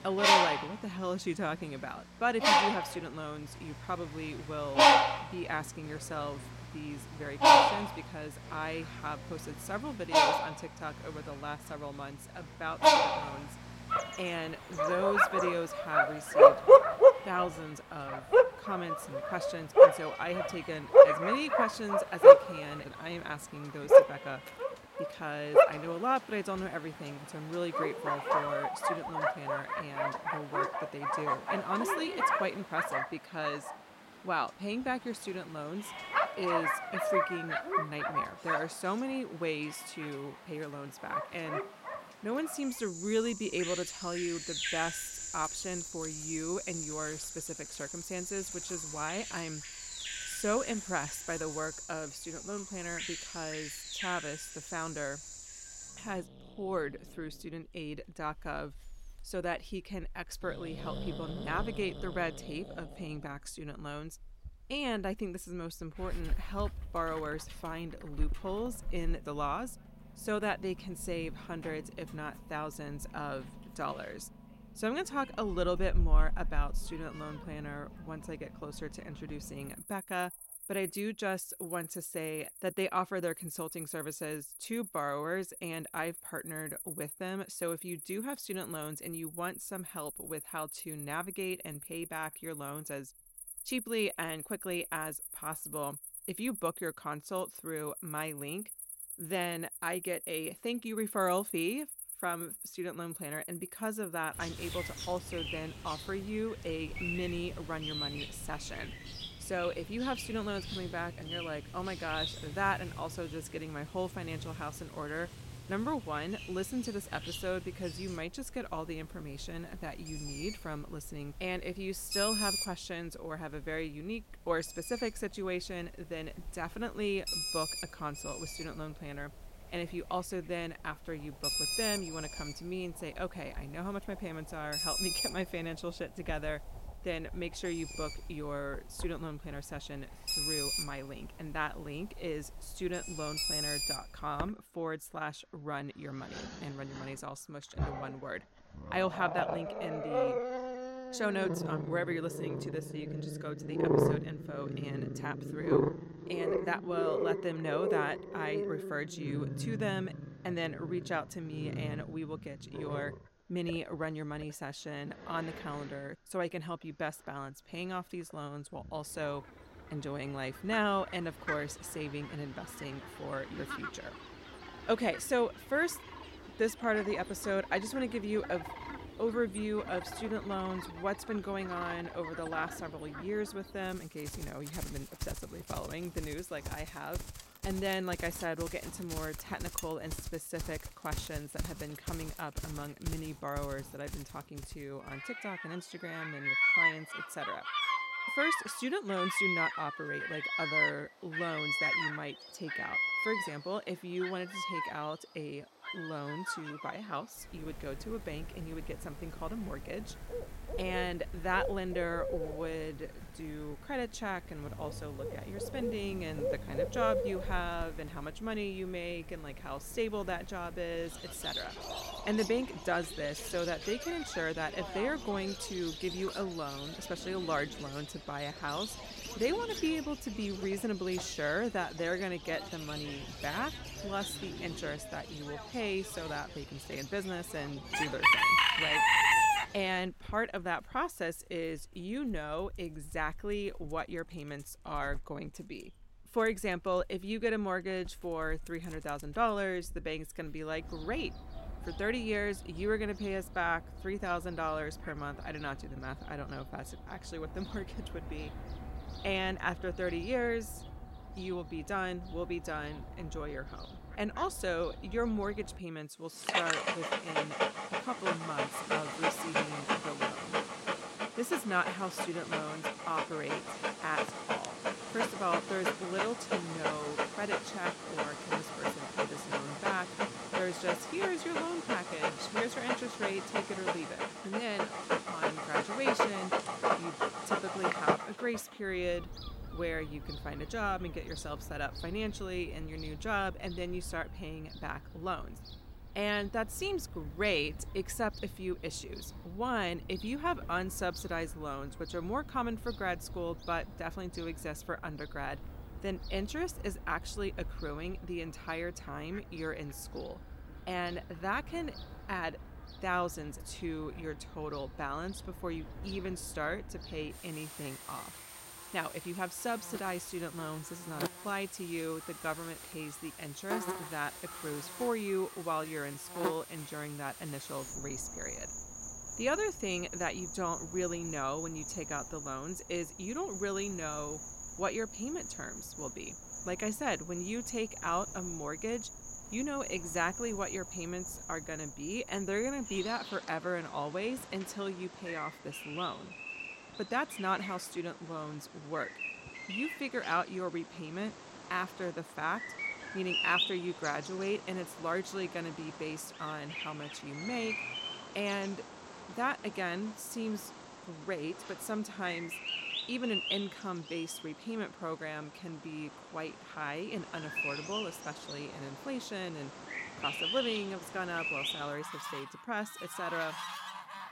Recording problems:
animal sounds; very loud; throughout; 5 dB above the speech

